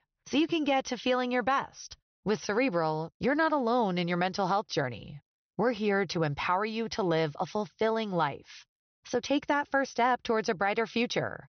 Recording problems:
high frequencies cut off; noticeable; nothing above 6 kHz

